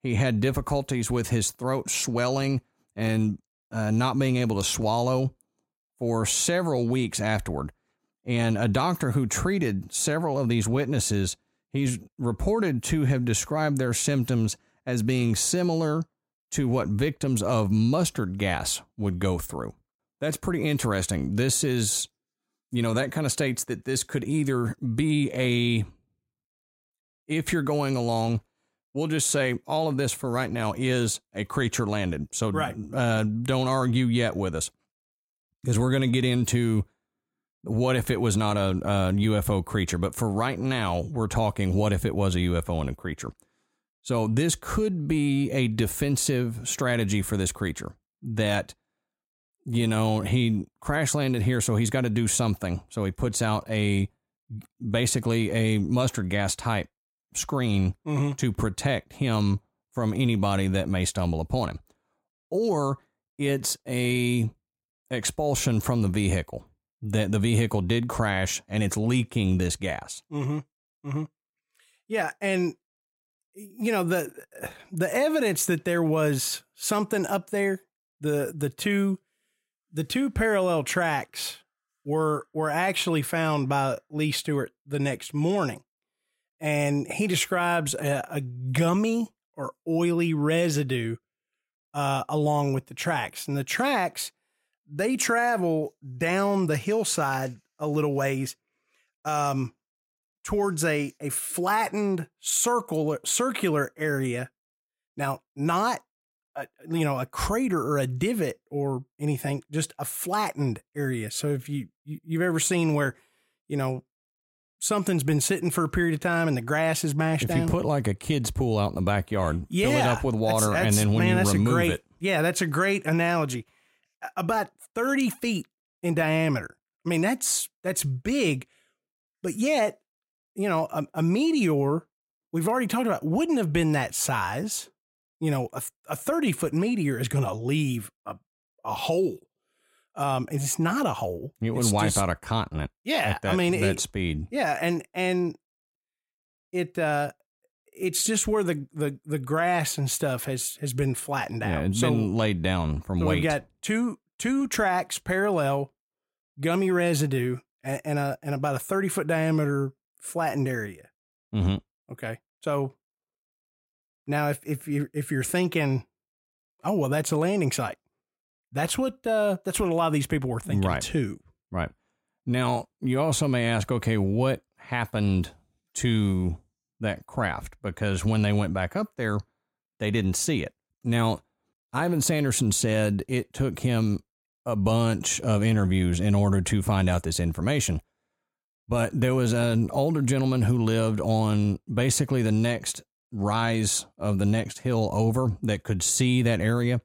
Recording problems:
none

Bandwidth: 16 kHz